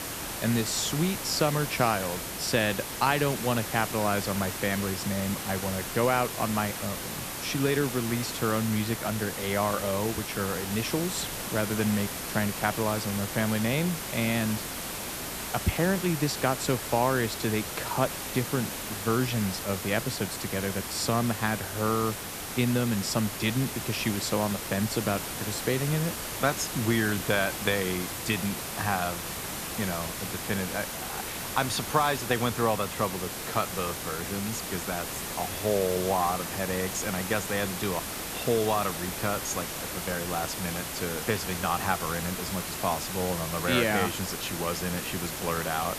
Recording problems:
hiss; loud; throughout; 4 dB below the speech

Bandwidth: 14.5 kHz